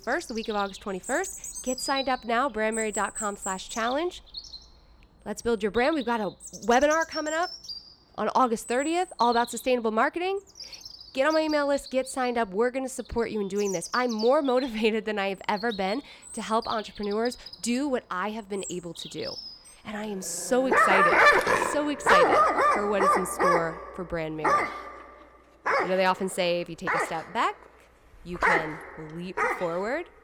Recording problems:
animal sounds; very loud; throughout; 1 dB above the speech

